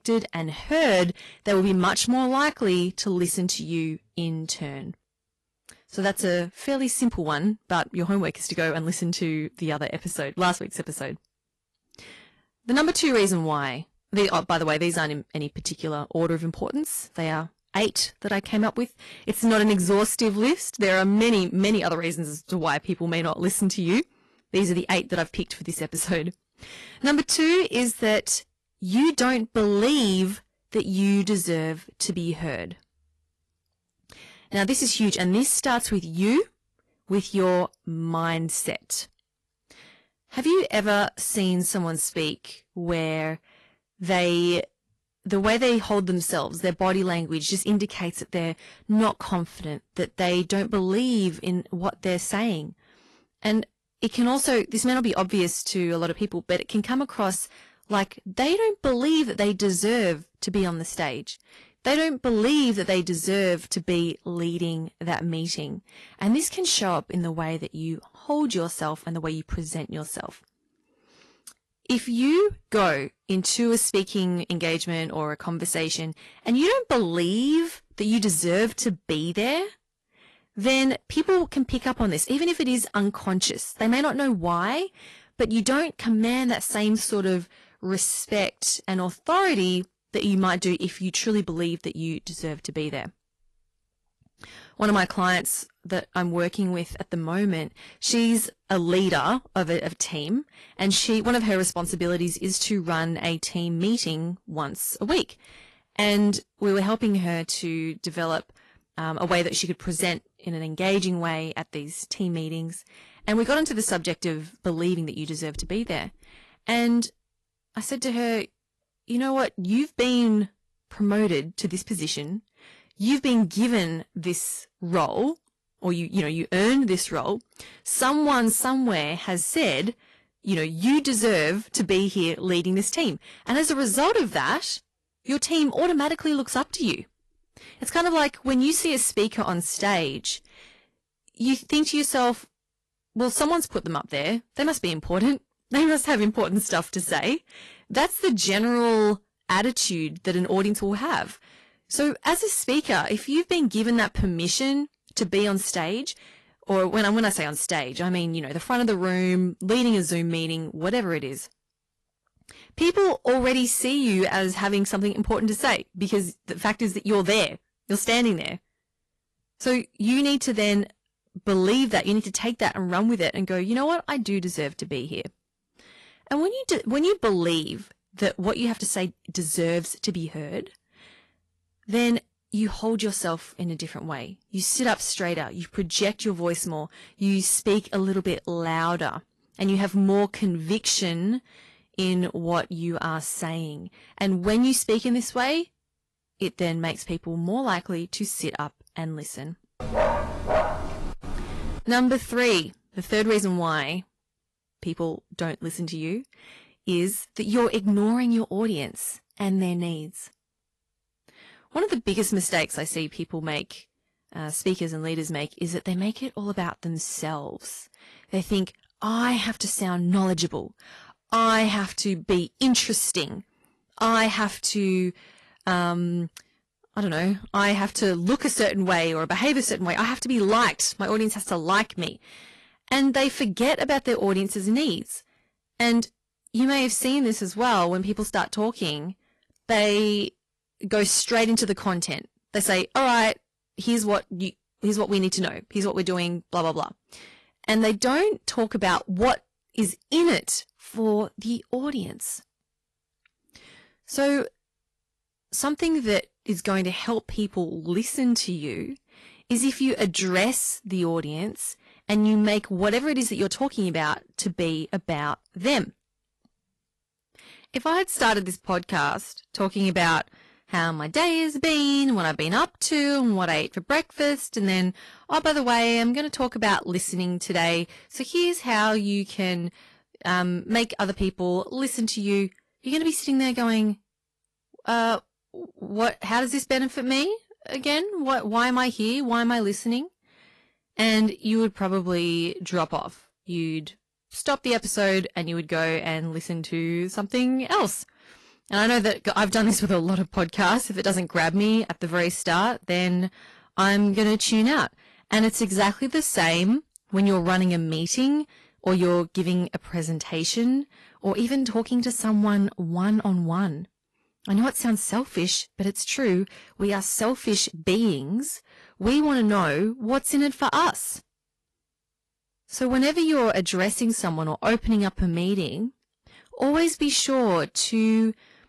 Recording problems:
distortion; slight; 4% of the sound clipped
garbled, watery; slightly; nothing above 11.5 kHz
dog barking; loud; from 3:20 to 3:22; peak level with the speech

